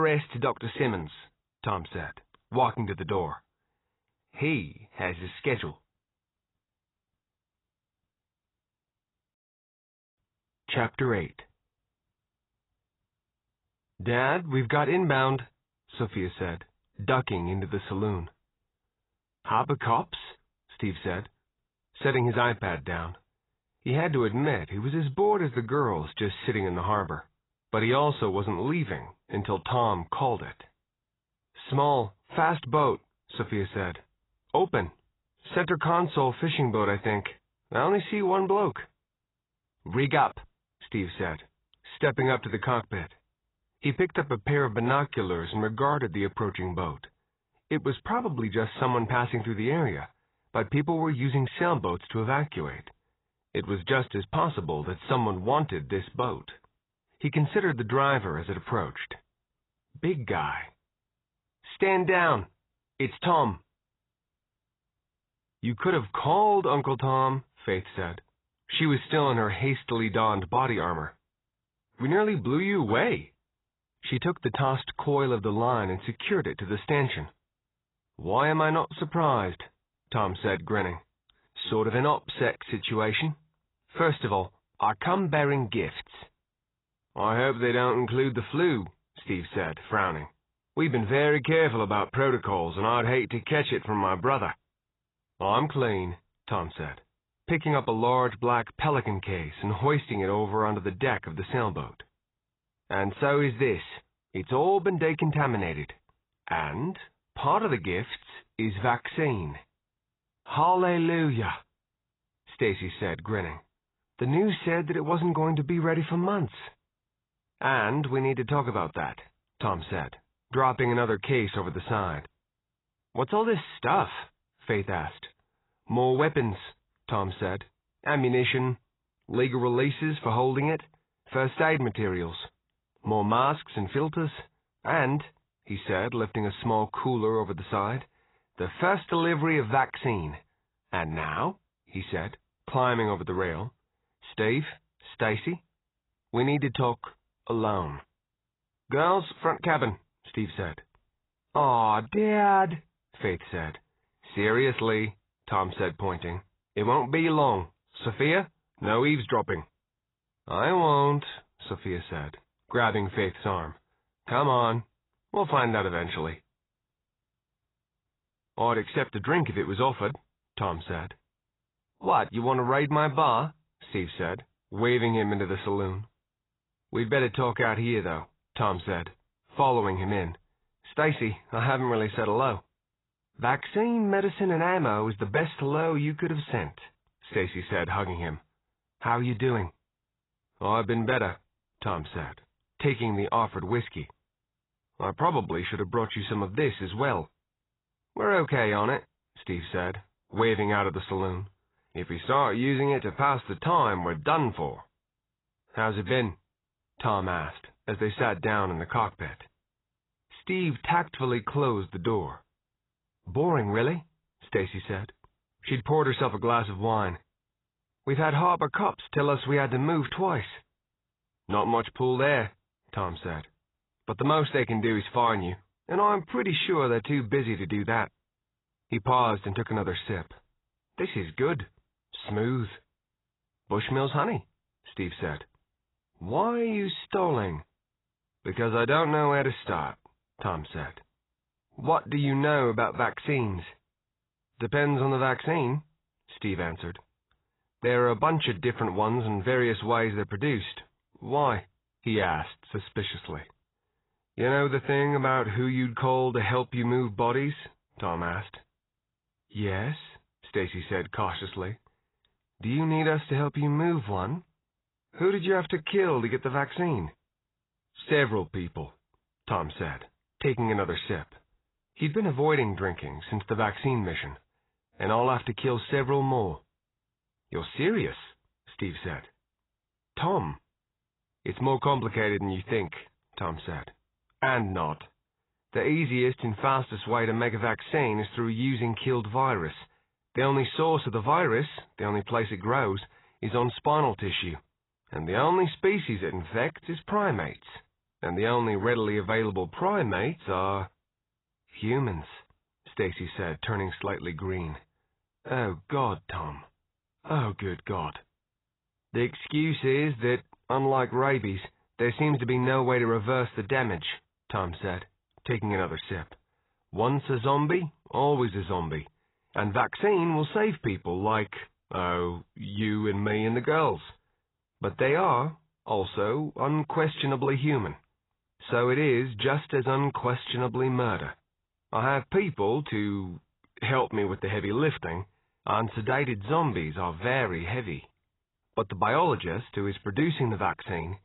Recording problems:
garbled, watery; badly; nothing above 4 kHz
abrupt cut into speech; at the start

